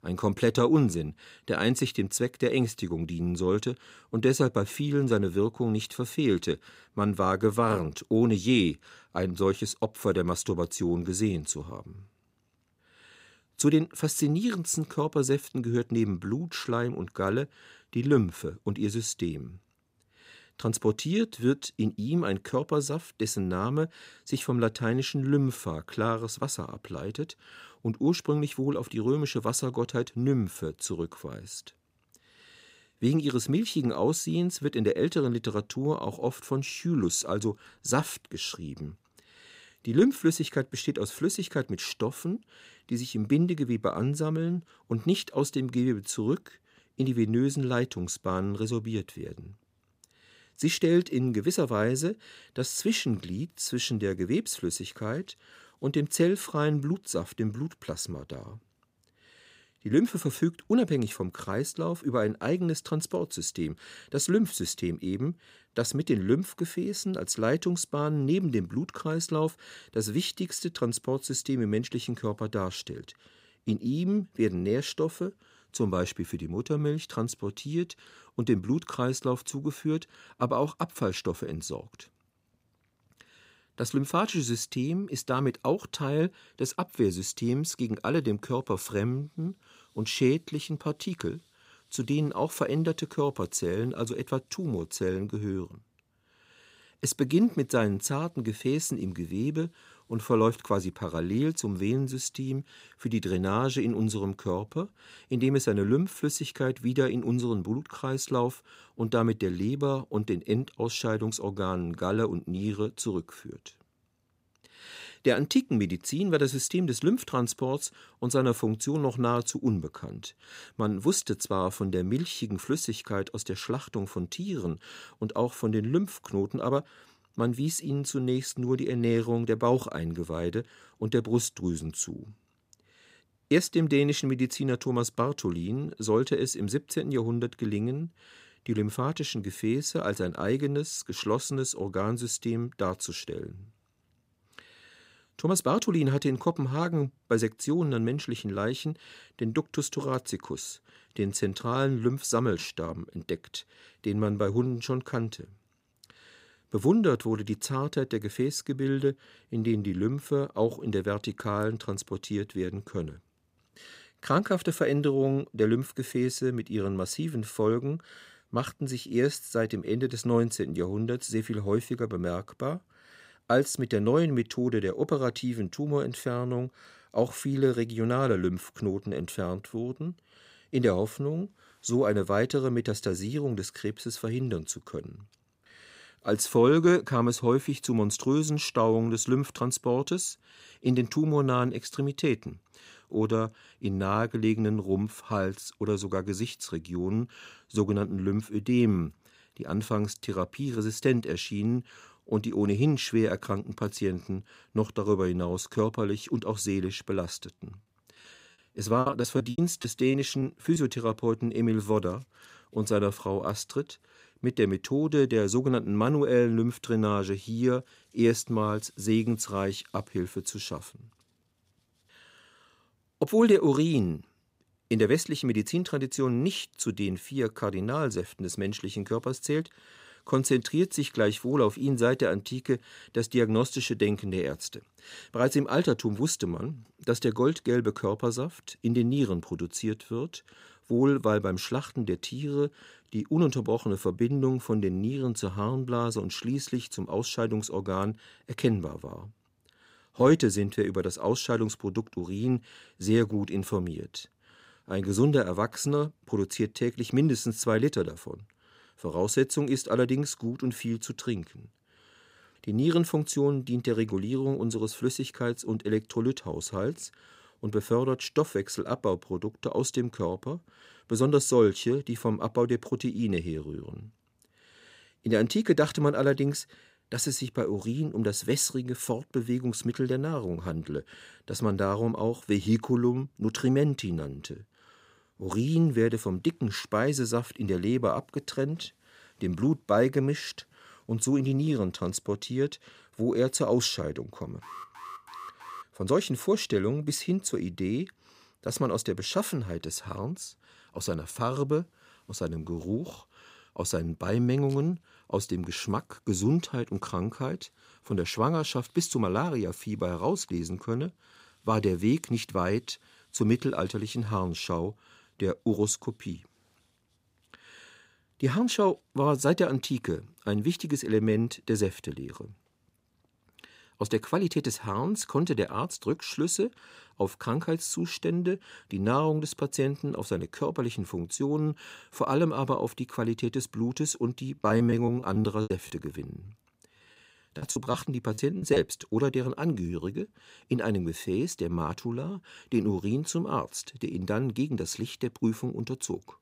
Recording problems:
choppy; very; from 3:29 to 3:31 and from 5:35 to 5:39; 15% of the speech affected
alarm; faint; from 4:55 to 4:56; peak 15 dB below the speech

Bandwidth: 15.5 kHz